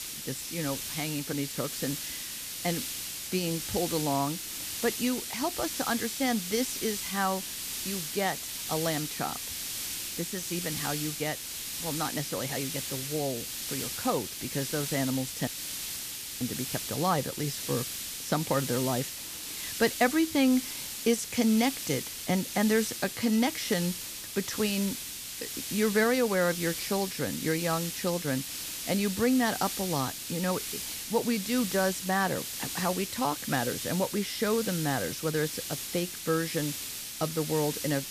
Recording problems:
hiss; loud; throughout; 4 dB below the speech
audio cutting out; at 15 s for 1 s

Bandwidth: 14.5 kHz